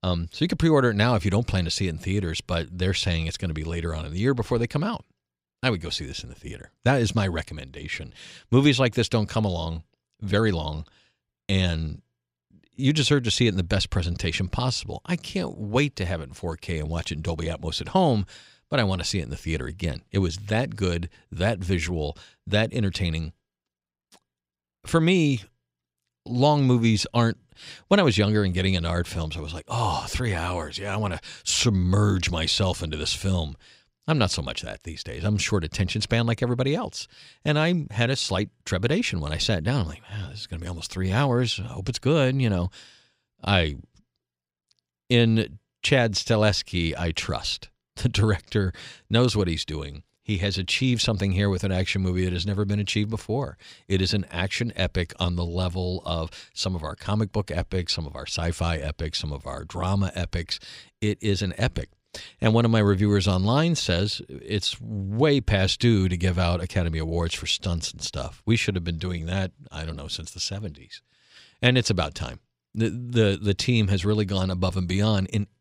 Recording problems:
none

